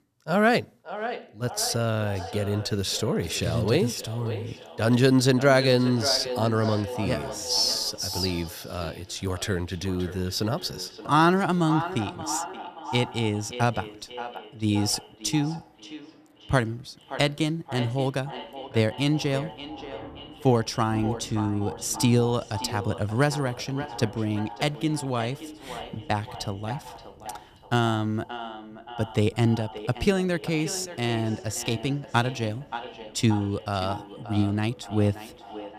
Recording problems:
echo of what is said; noticeable; throughout; 580 ms later, 10 dB below the speech
rain or running water; faint; from 8 s on; 25 dB below the speech

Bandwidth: 14.5 kHz